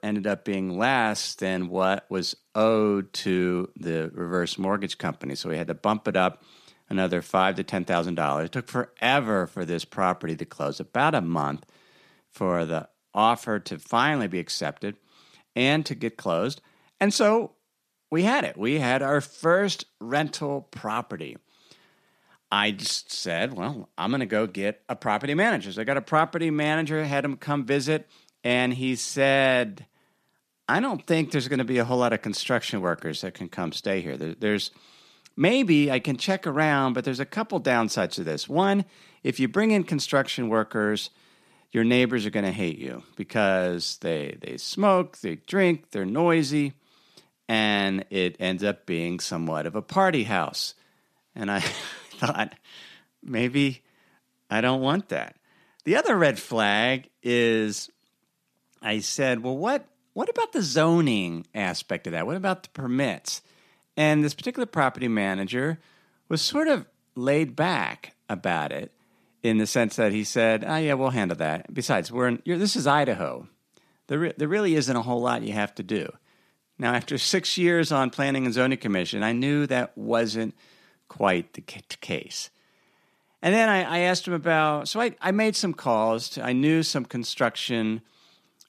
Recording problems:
none

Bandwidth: 14.5 kHz